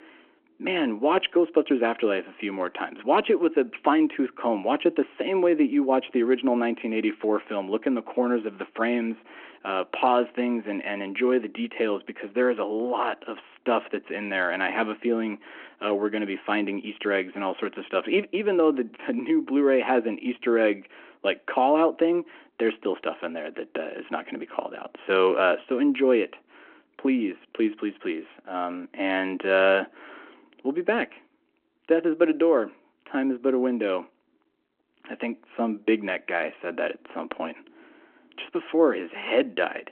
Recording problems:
phone-call audio

